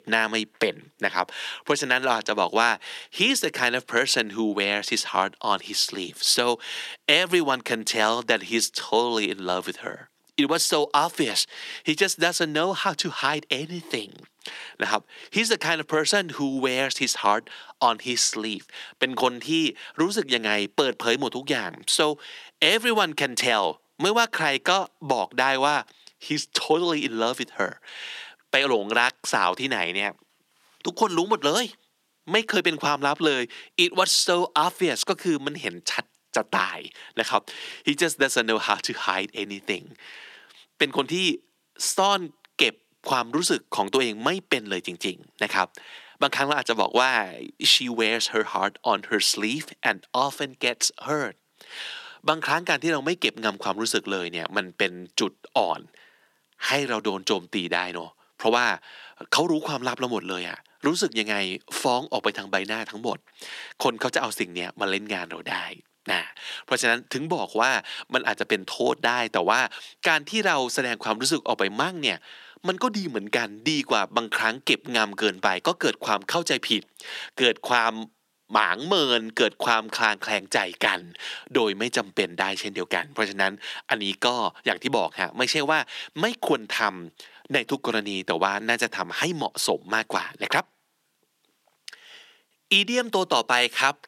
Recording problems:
thin; somewhat; fading below 300 Hz

